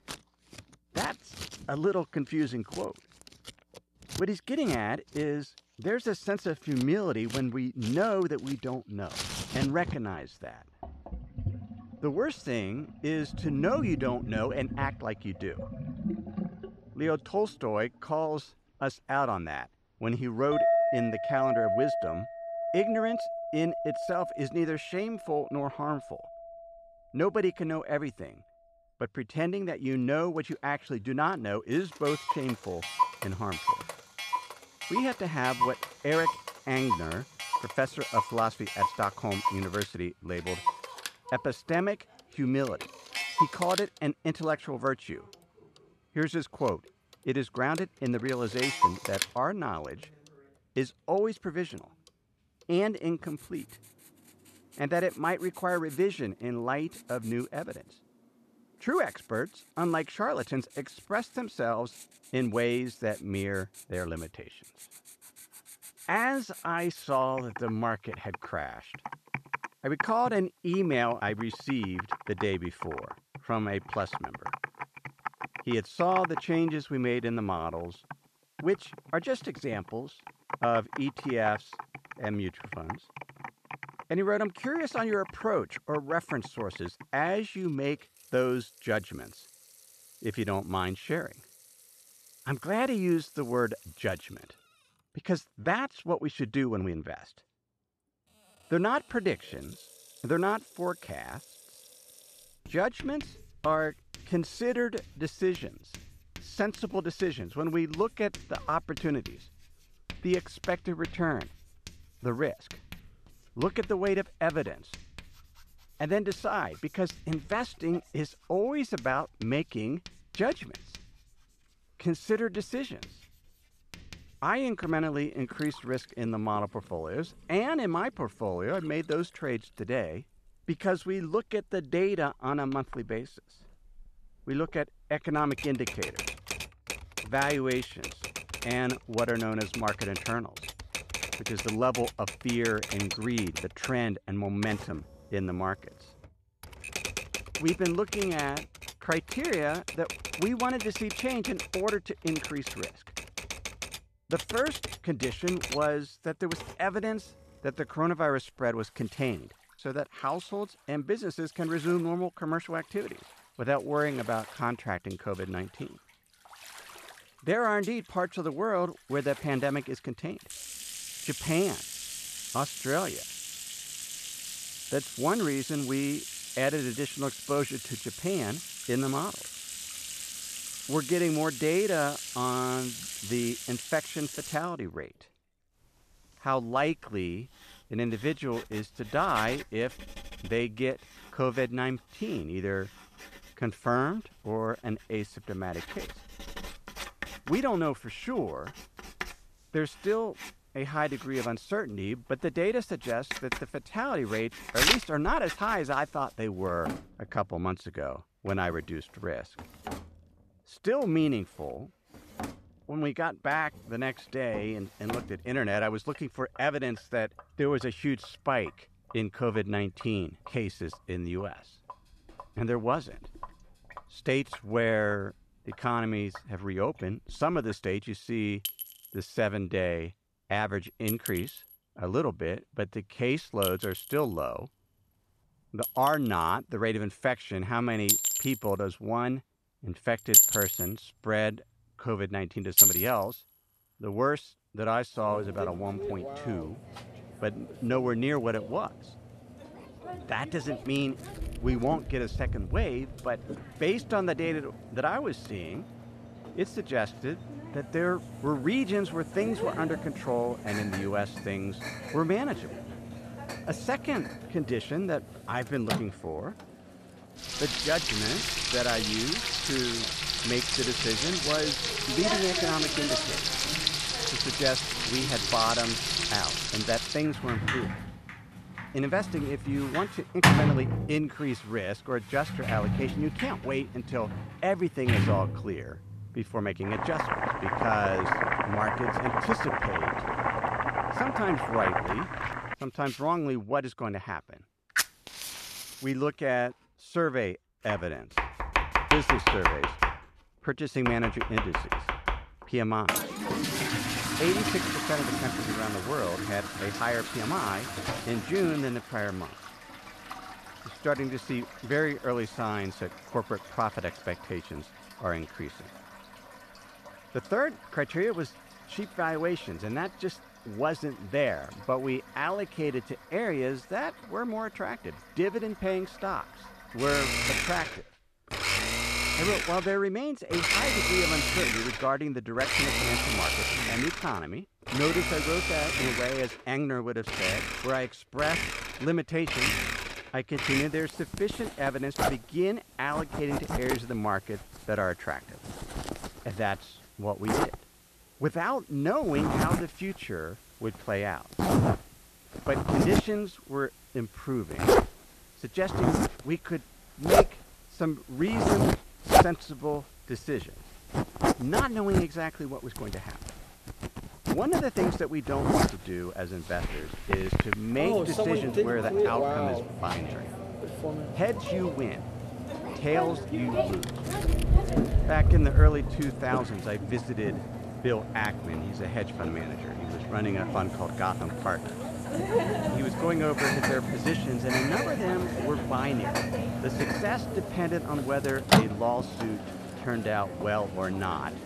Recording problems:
household noises; very loud; throughout; 1 dB above the speech

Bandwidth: 14 kHz